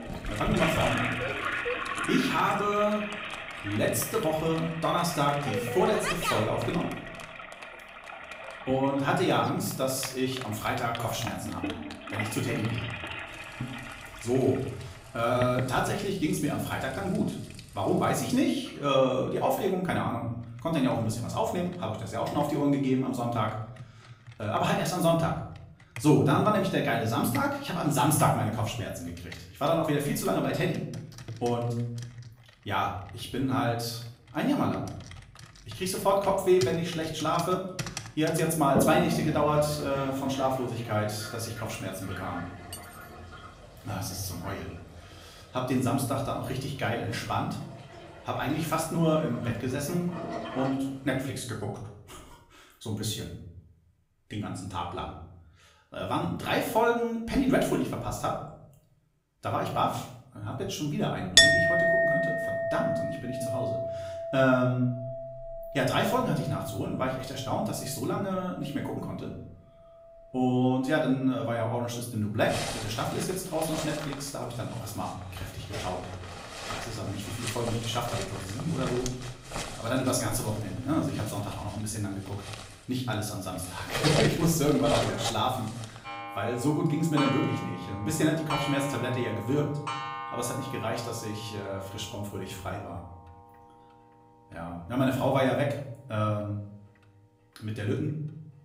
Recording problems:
off-mic speech; far
room echo; slight; dies away in 0.7 s
household noises; loud; throughout; 4 dB below the speech
clattering dishes; faint; at 43 s; peak 15 dB below the speech

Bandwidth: 15.5 kHz